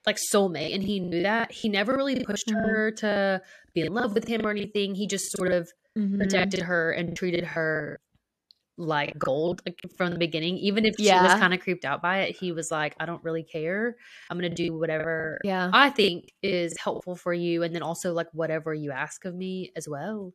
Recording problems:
choppy; very; from 0.5 to 4.5 s, from 5 to 10 s and from 14 to 17 s; 18% of the speech affected

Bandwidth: 14 kHz